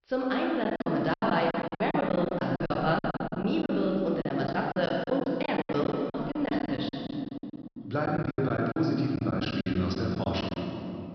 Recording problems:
room echo; noticeable; dies away in 3 s
high frequencies cut off; noticeable; nothing above 5.5 kHz
off-mic speech; somewhat distant
choppy; very; 17% of the speech affected

